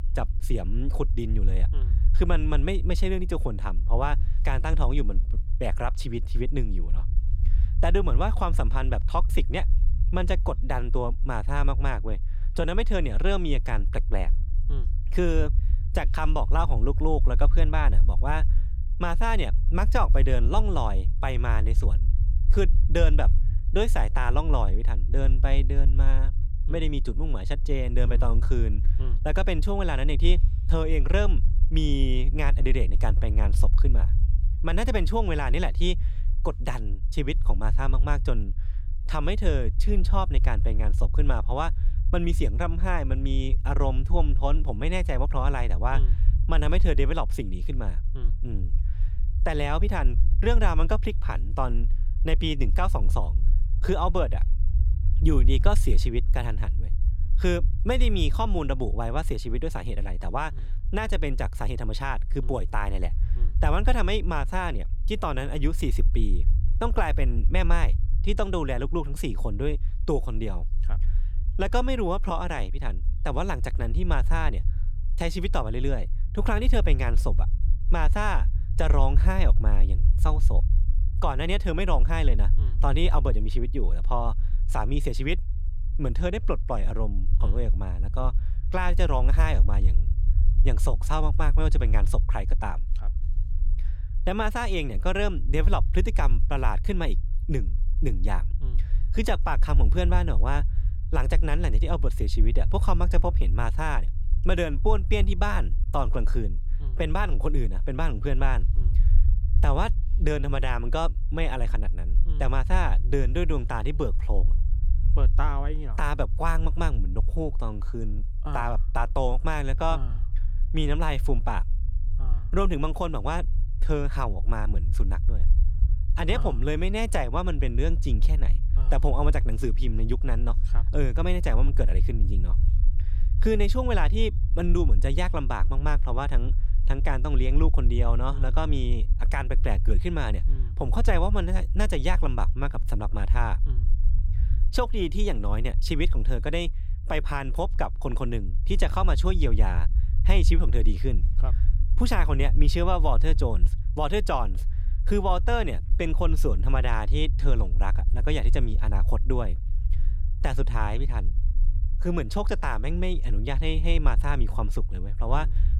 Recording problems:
low rumble; noticeable; throughout; 15 dB below the speech

